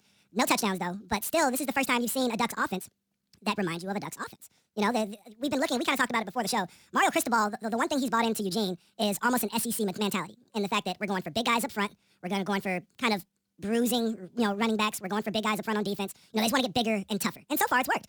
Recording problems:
wrong speed and pitch; too fast and too high; 1.6 times normal speed

